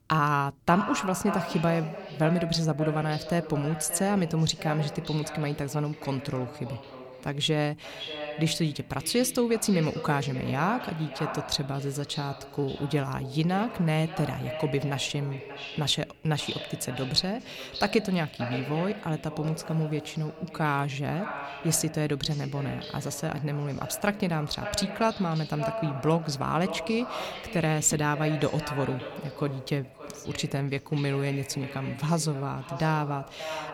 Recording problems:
echo of what is said; strong; throughout; 580 ms later, 10 dB below the speech

